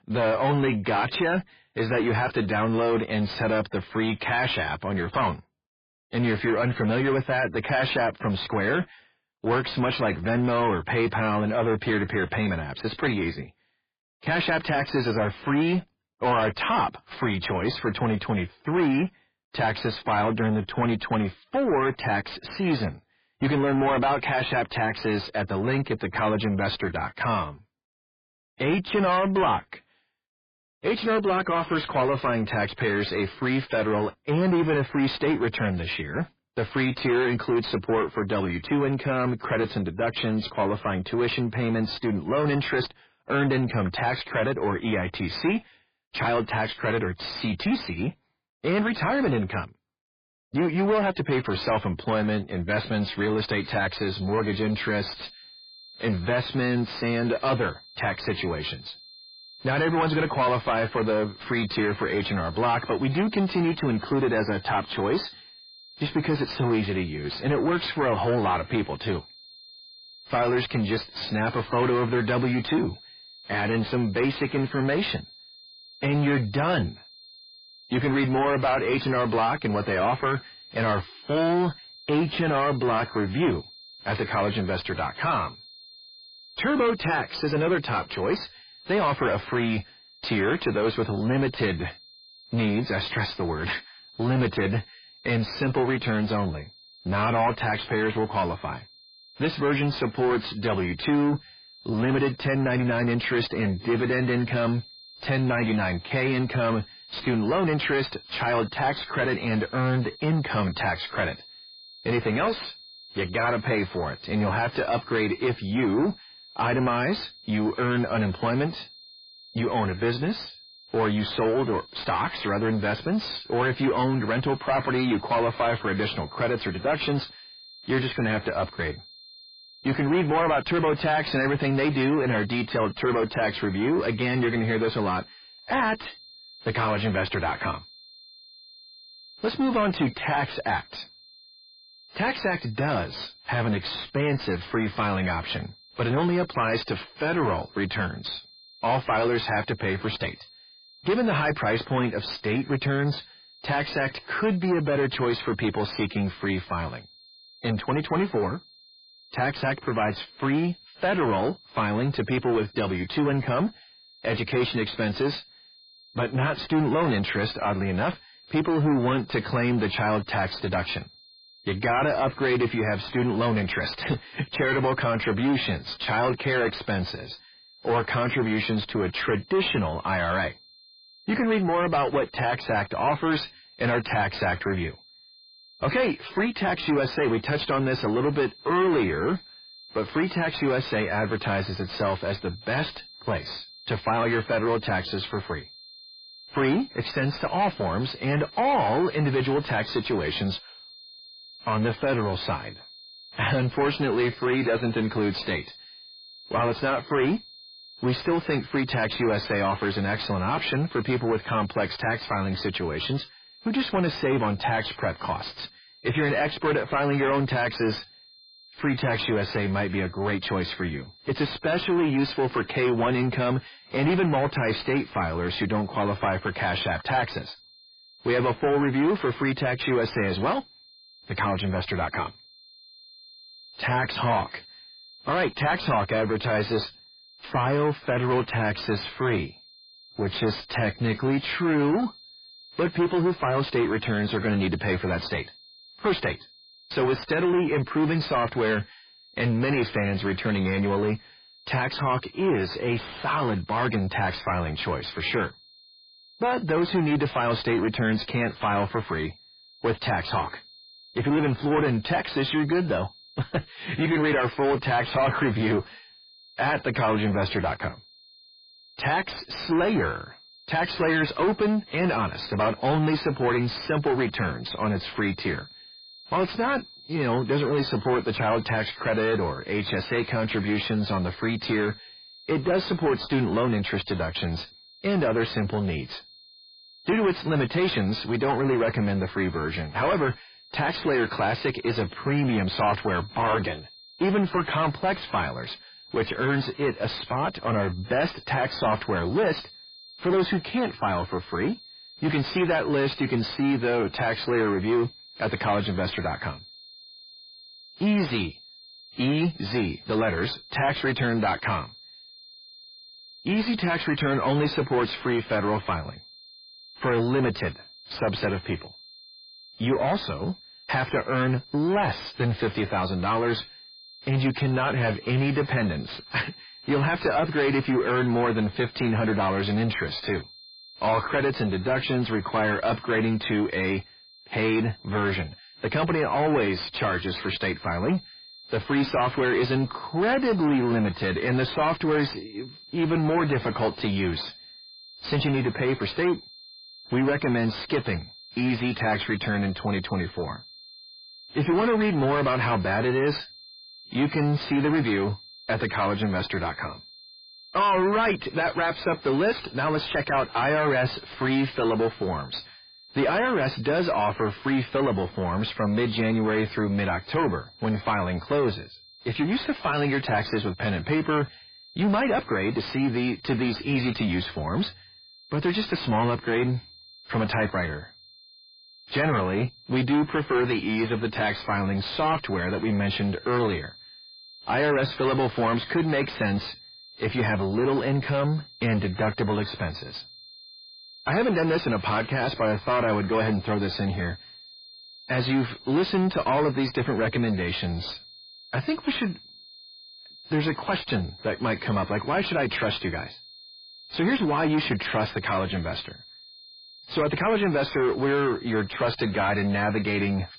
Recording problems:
distortion; heavy; 6 dB below the speech
garbled, watery; badly
high-pitched whine; faint; from 53 s on; 4 kHz, 20 dB below the speech

